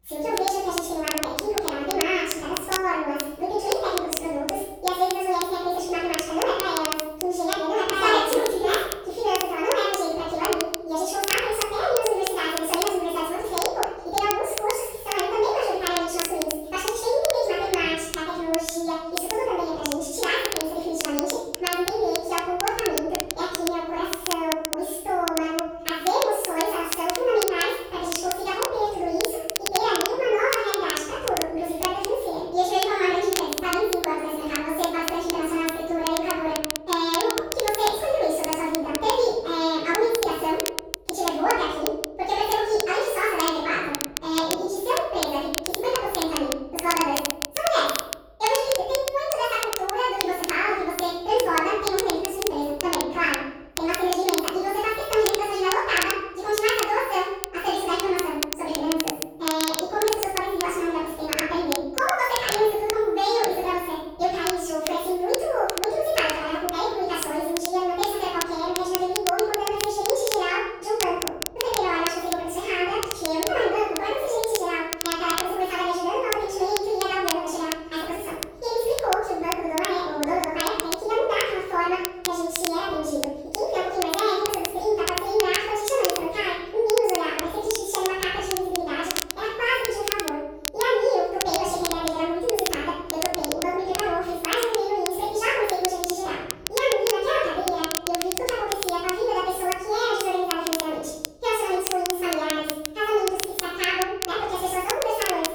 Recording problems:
room echo; strong; dies away in 1 s
off-mic speech; far
wrong speed and pitch; too fast and too high; 1.7 times normal speed
crackle, like an old record; very faint; 6 dB below the speech

